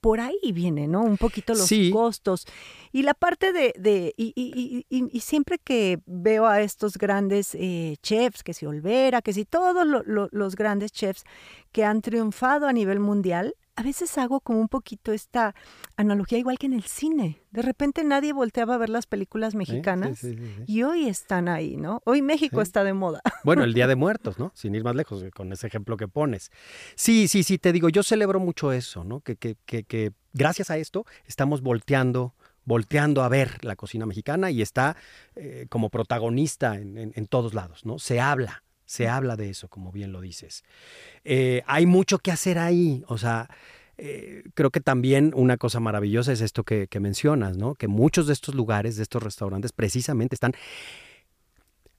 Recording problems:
uneven, jittery; strongly; from 8.5 to 51 s

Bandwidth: 15 kHz